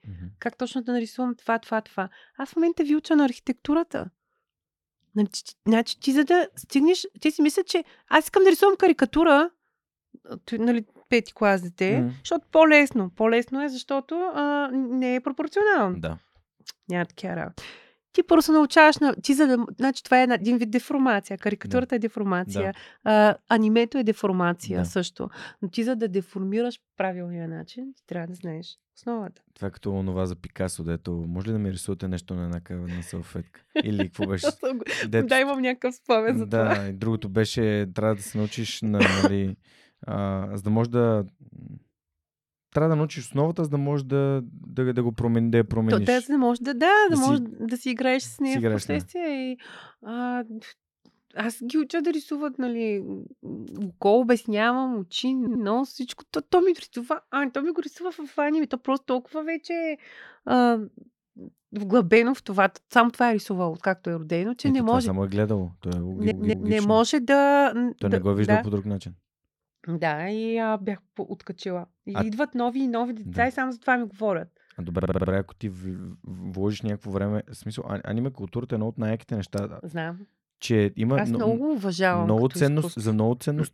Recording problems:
audio stuttering; at 55 s, at 1:06 and at 1:15

